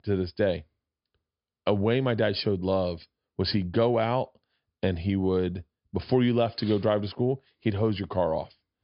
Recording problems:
high frequencies cut off; noticeable; nothing above 5 kHz

